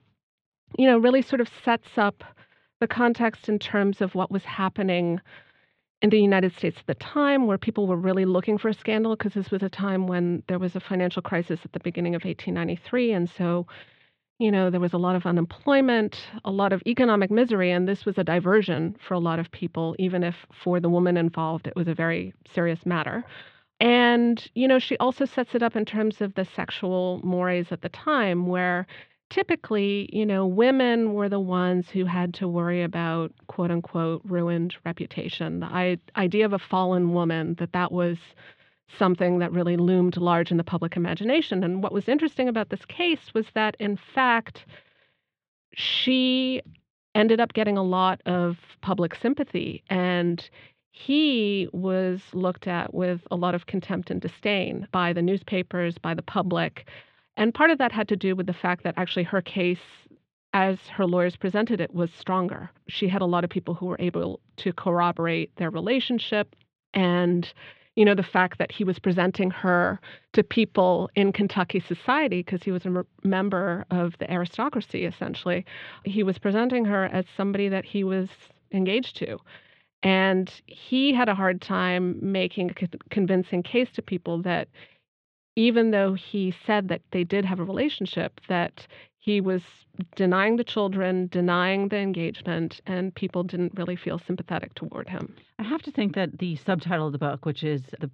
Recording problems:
muffled; very; fading above 3.5 kHz

